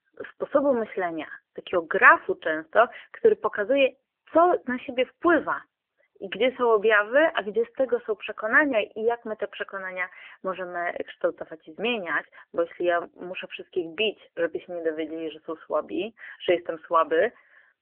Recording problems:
phone-call audio; nothing above 3 kHz

